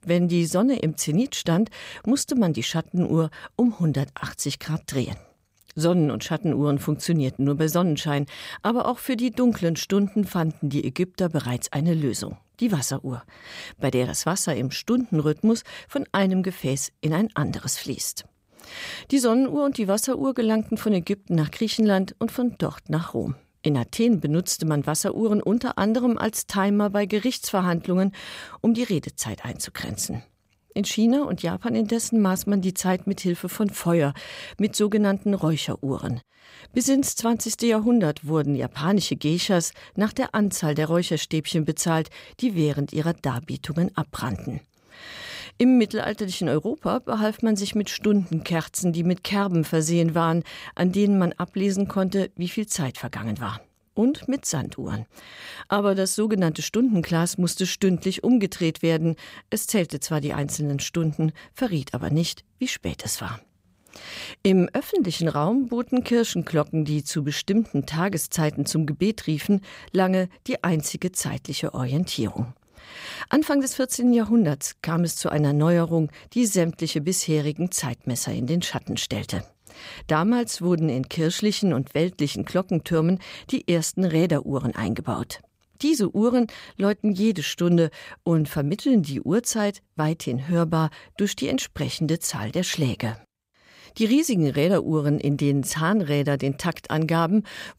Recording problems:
none

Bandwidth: 15.5 kHz